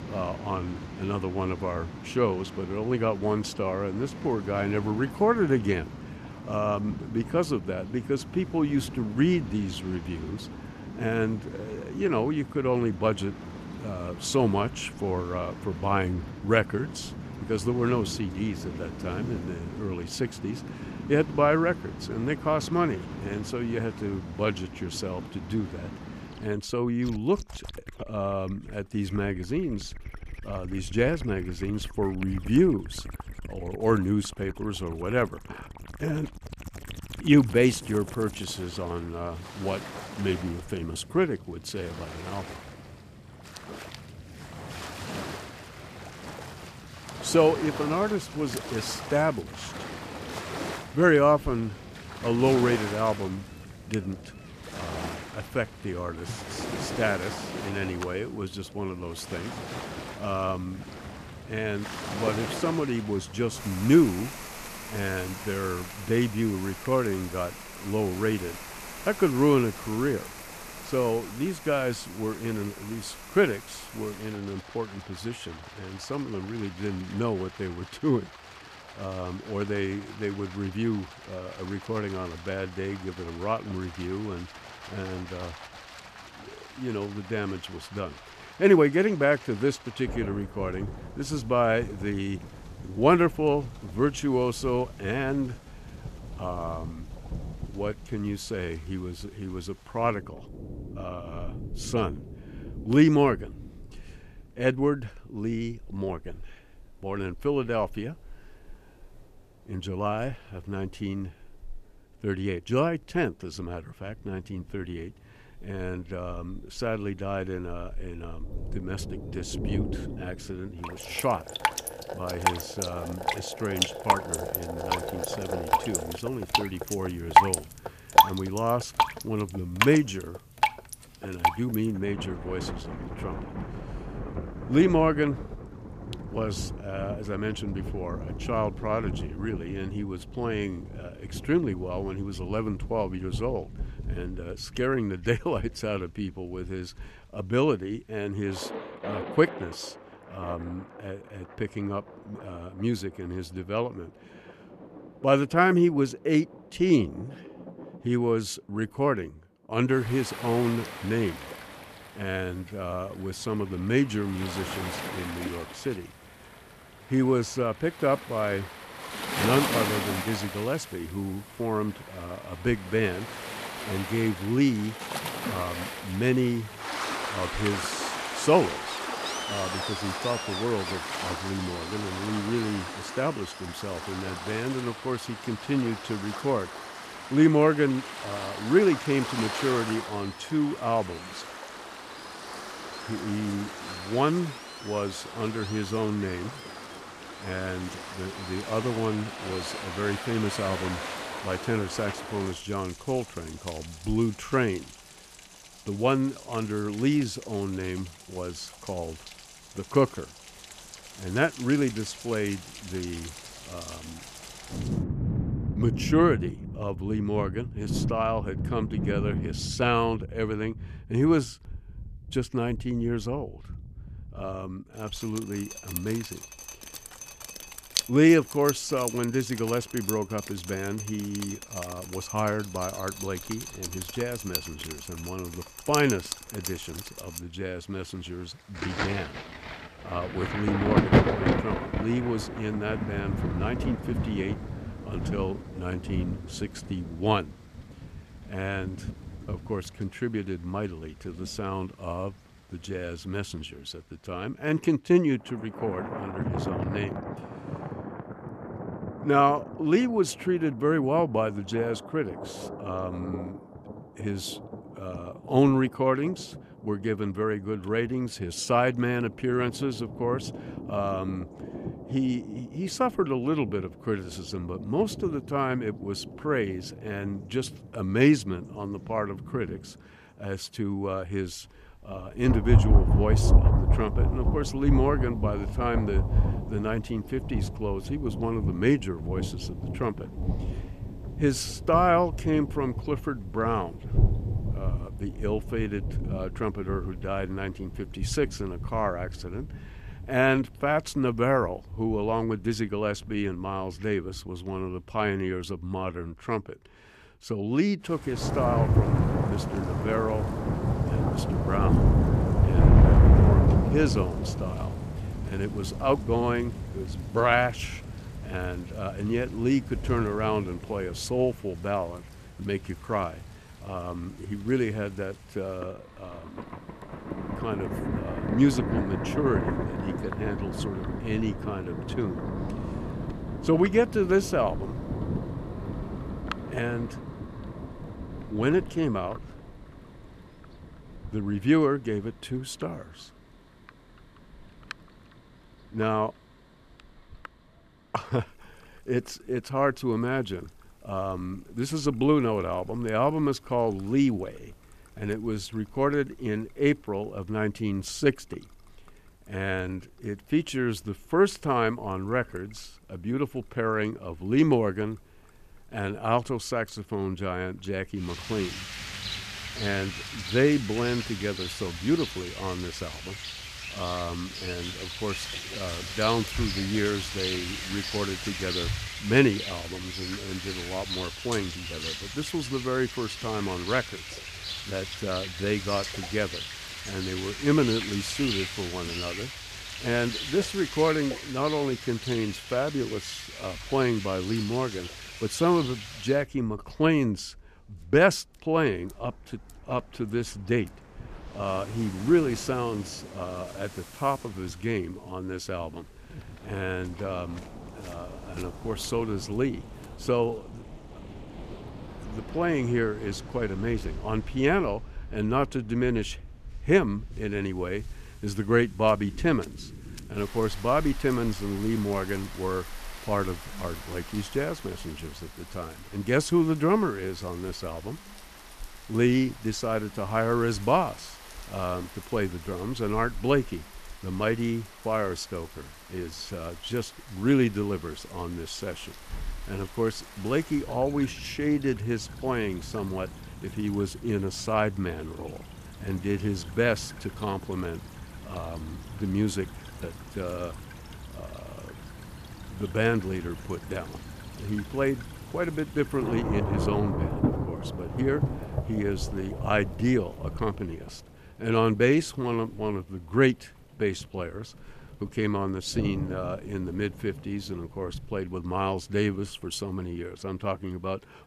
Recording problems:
rain or running water; loud; throughout; 5 dB below the speech

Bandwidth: 14.5 kHz